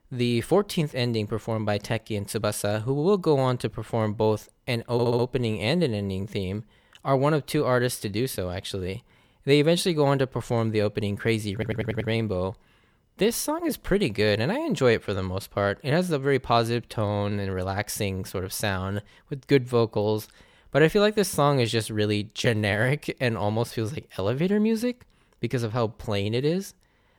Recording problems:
audio stuttering; at 5 s and at 12 s

